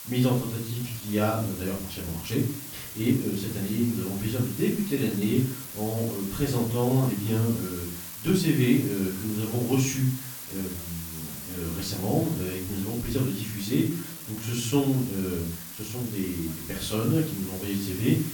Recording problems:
off-mic speech; far
room echo; slight; dies away in 0.4 s
hiss; loud; throughout; 9 dB below the speech
background chatter; faint; throughout; 3 voices, 25 dB below the speech
uneven, jittery; strongly; from 0.5 to 16 s

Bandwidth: 18 kHz